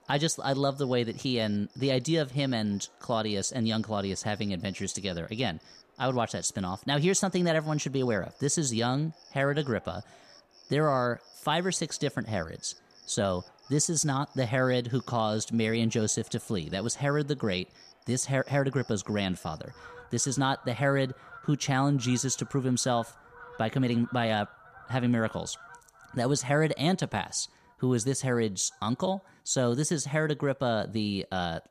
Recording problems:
animal sounds; faint; throughout; 25 dB below the speech

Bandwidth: 14.5 kHz